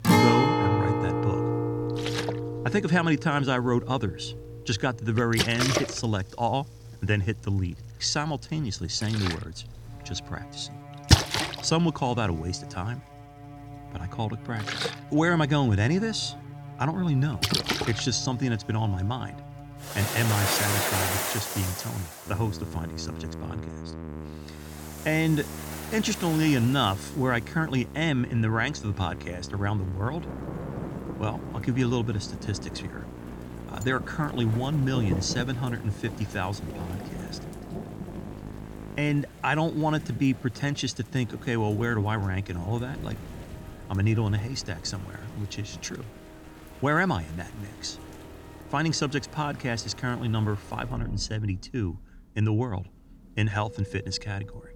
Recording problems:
background music; loud; throughout; 8 dB below the speech
rain or running water; loud; throughout; 5 dB below the speech

